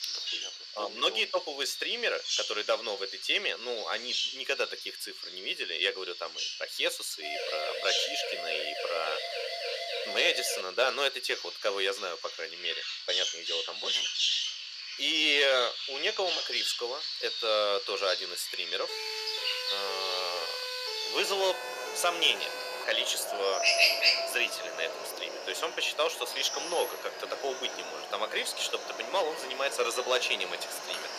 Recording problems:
thin; very; fading below 450 Hz
animal sounds; loud; throughout; 2 dB below the speech
siren; noticeable; from 7 to 11 s and from 19 to 23 s; peak 4 dB below the speech

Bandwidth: 14.5 kHz